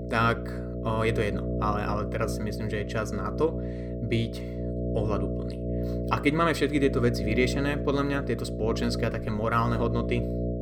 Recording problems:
electrical hum; loud; throughout; 60 Hz, 7 dB below the speech

